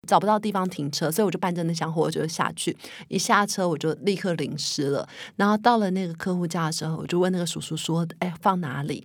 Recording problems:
uneven, jittery; strongly; from 1.5 to 8.5 s

